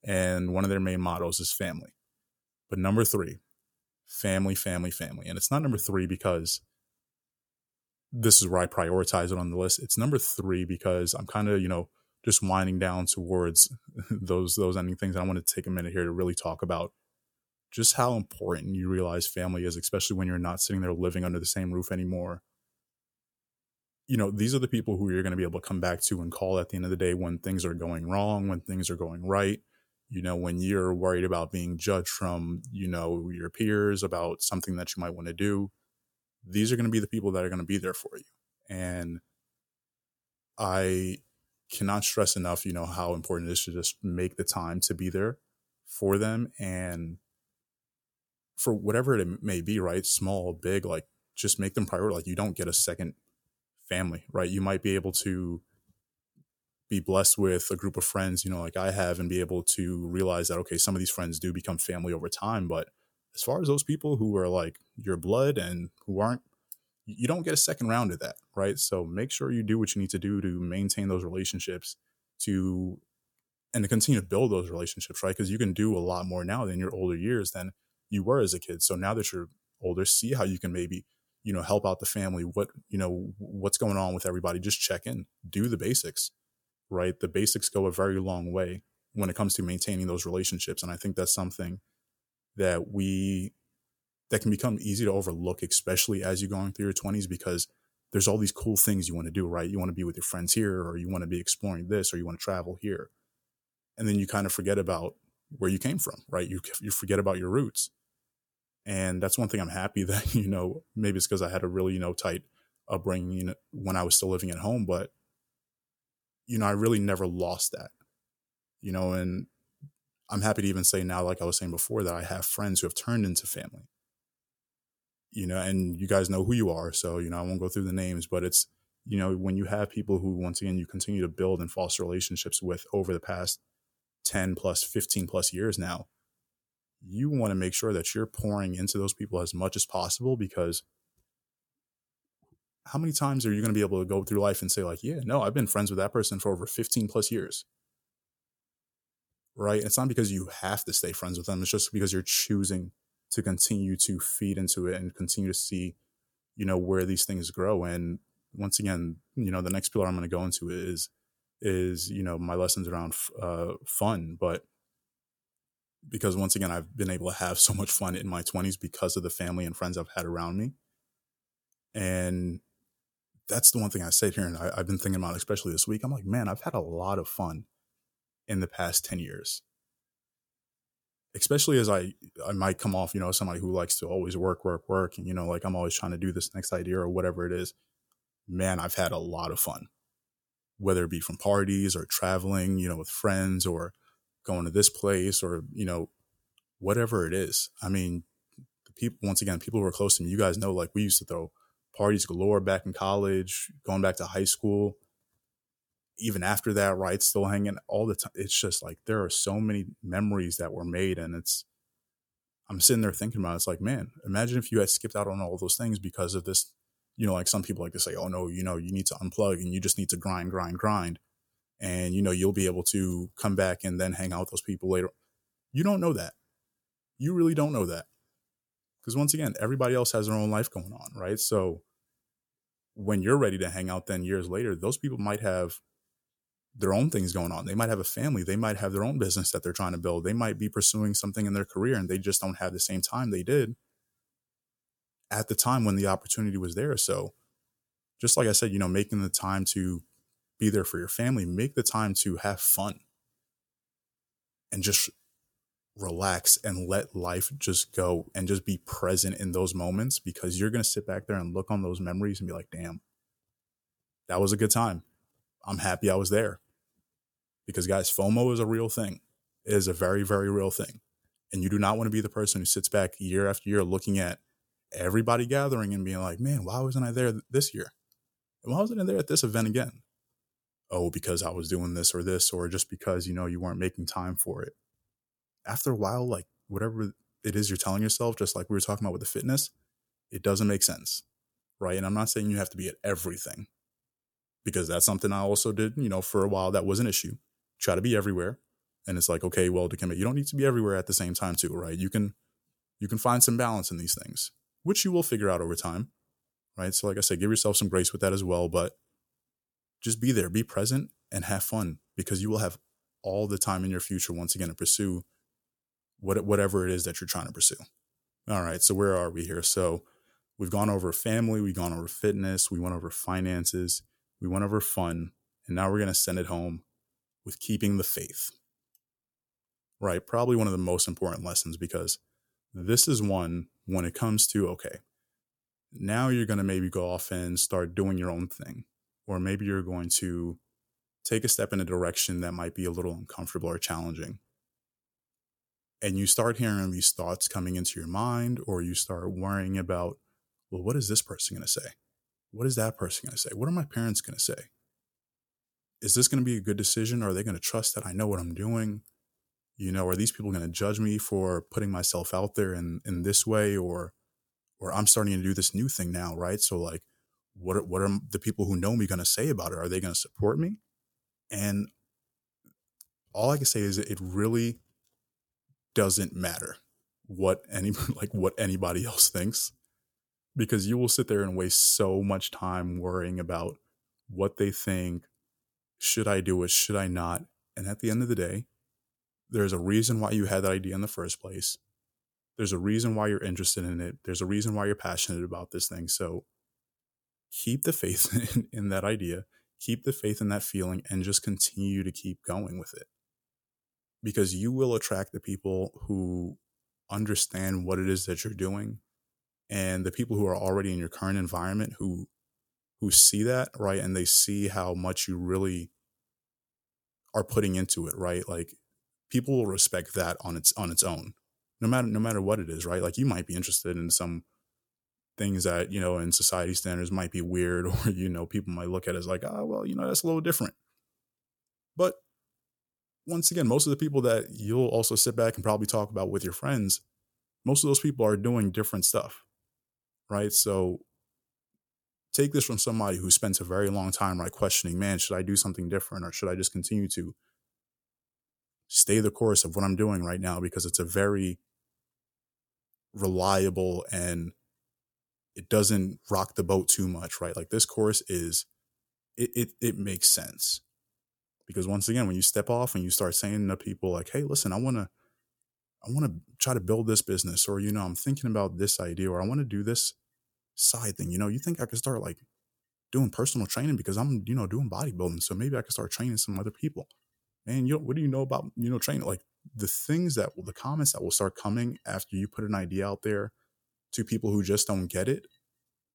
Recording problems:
none

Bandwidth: 18 kHz